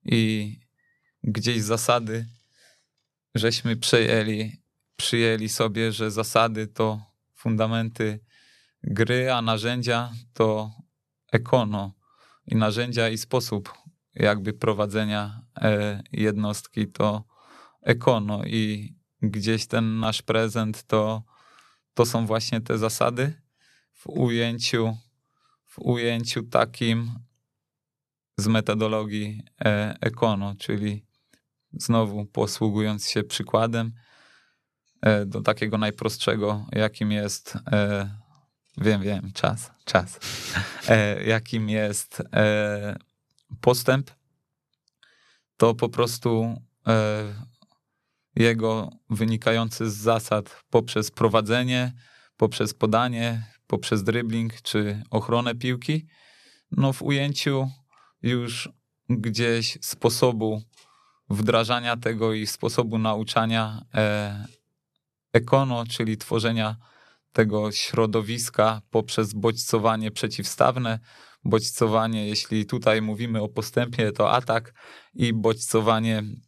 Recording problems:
none

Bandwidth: 13.5 kHz